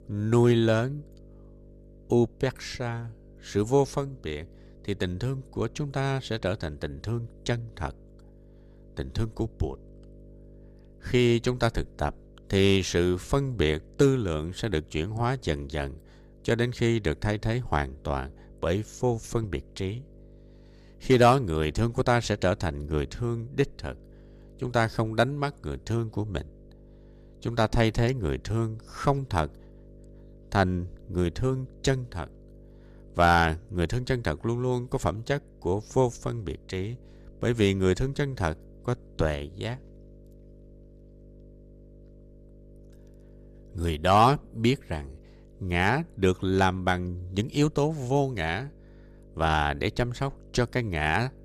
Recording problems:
electrical hum; faint; throughout; 50 Hz, 30 dB below the speech

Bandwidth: 14.5 kHz